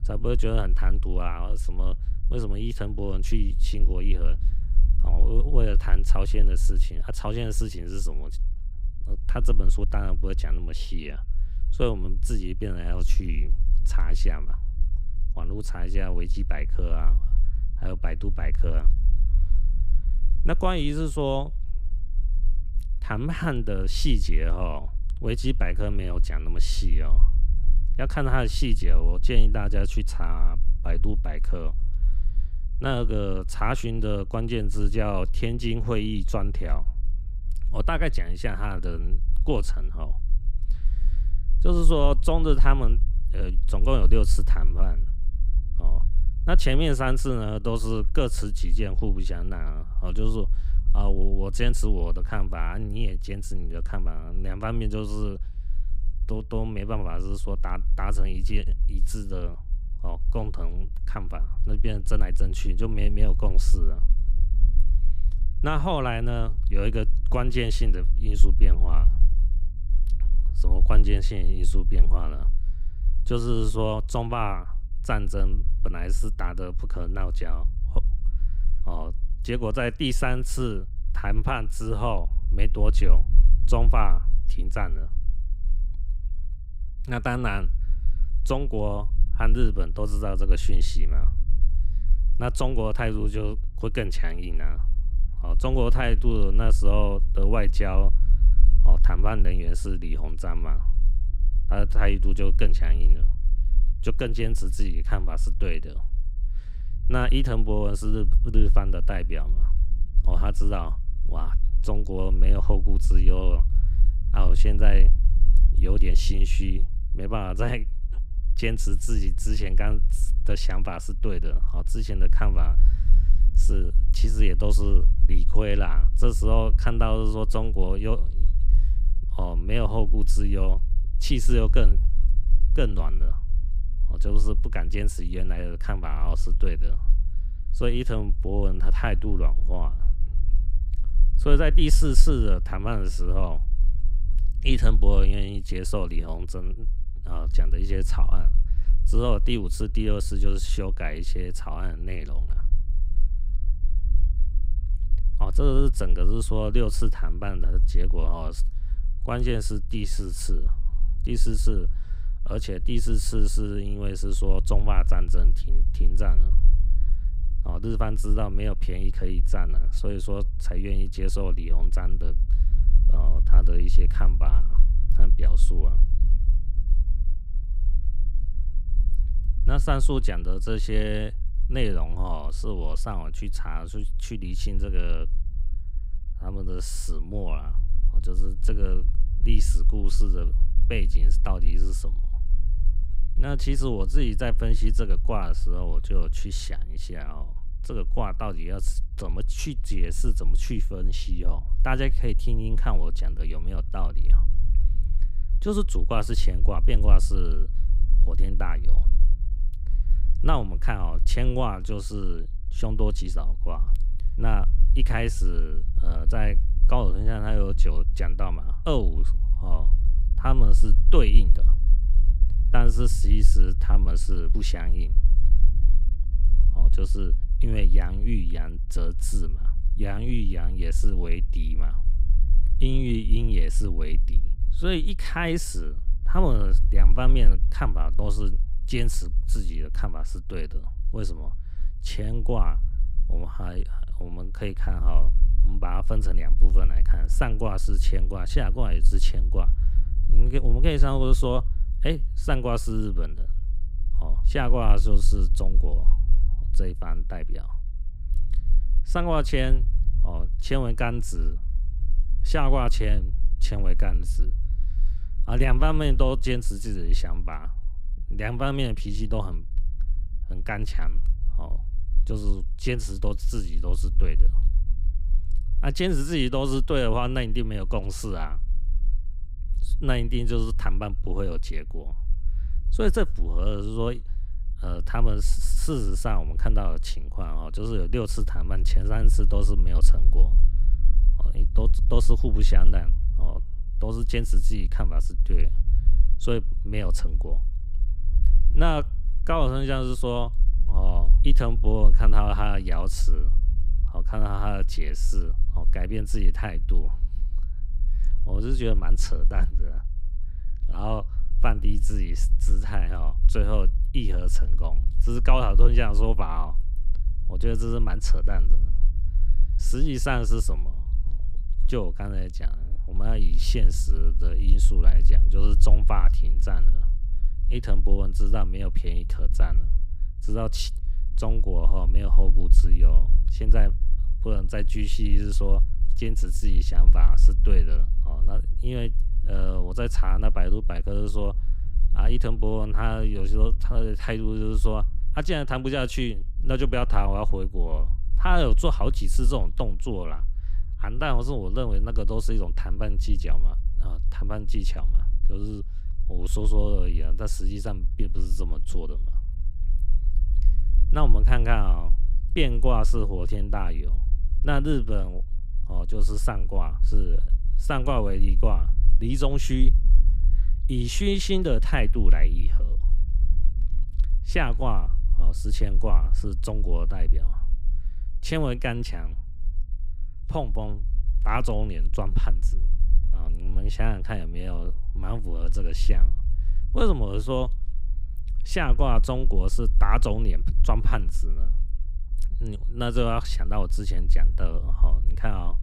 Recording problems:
low rumble; noticeable; throughout; 20 dB below the speech

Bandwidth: 15.5 kHz